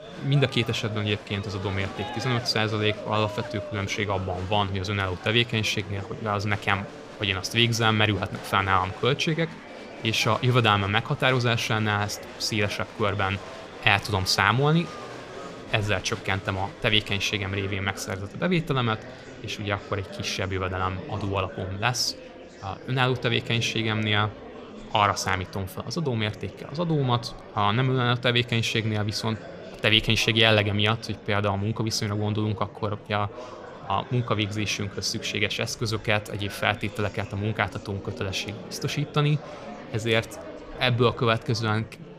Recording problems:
murmuring crowd; noticeable; throughout; 15 dB below the speech

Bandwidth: 15 kHz